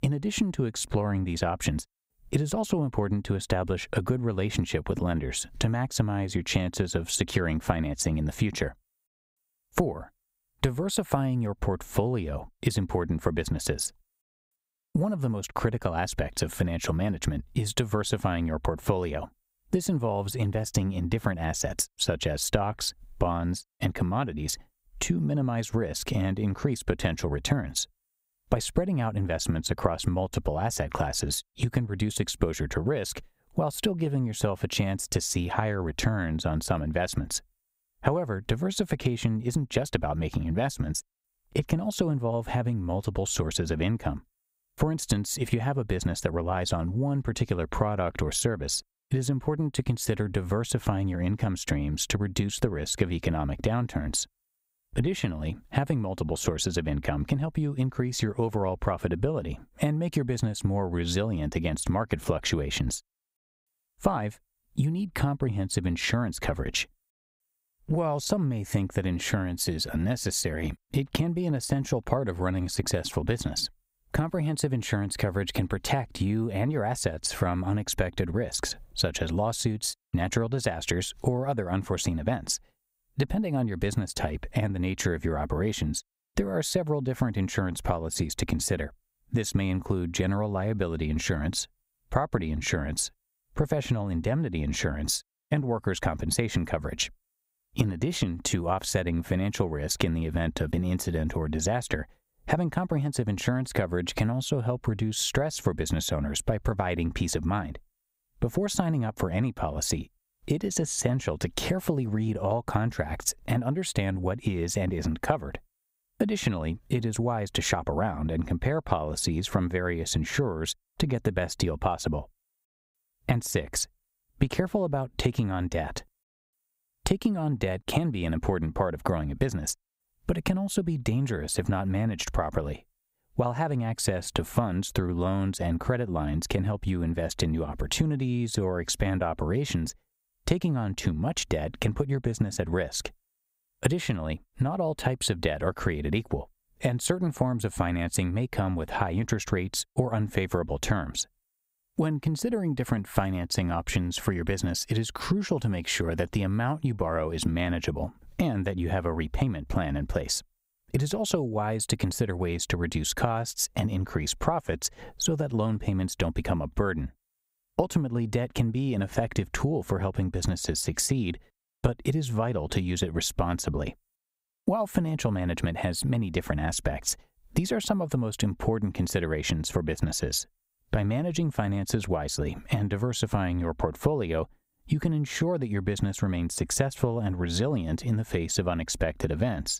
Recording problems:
squashed, flat; somewhat

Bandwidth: 15.5 kHz